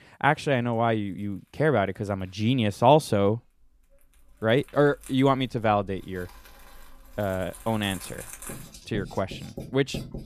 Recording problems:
household noises; noticeable; throughout; 15 dB below the speech

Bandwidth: 14.5 kHz